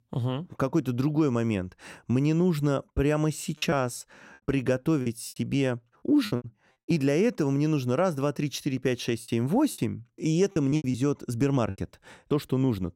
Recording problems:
choppy; very; from 3.5 to 7 s and from 9 to 12 s; 13% of the speech affected

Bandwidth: 16 kHz